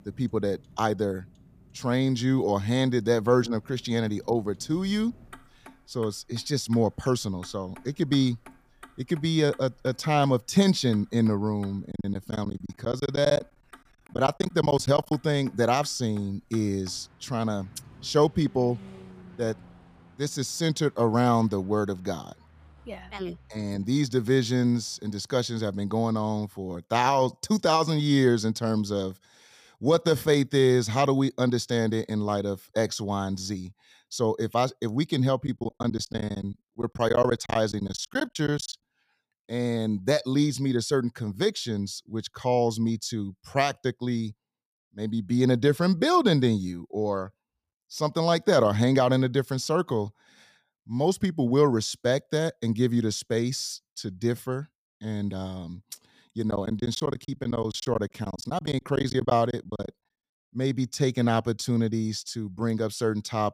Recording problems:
traffic noise; faint; until 25 s; 25 dB below the speech
choppy; very; from 12 to 15 s, from 35 to 39 s and from 57 s to 1:00; 19% of the speech affected

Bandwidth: 15 kHz